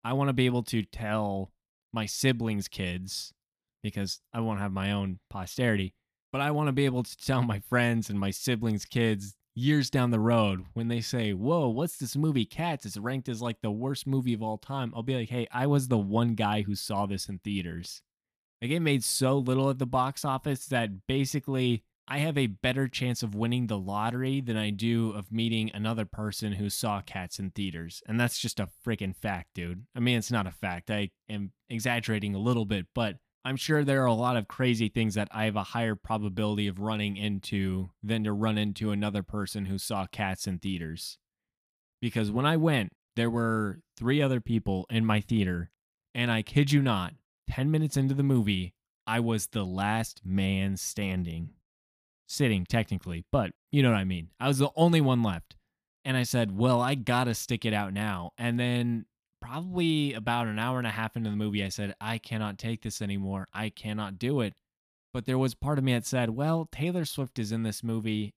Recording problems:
none

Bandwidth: 14.5 kHz